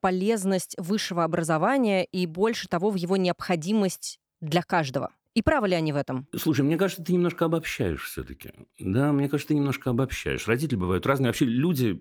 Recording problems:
none

